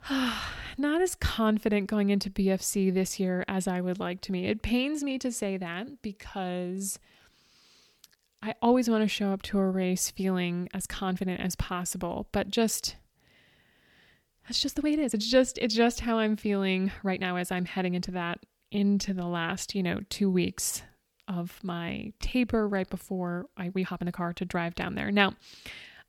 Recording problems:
uneven, jittery; strongly; from 1 to 24 s

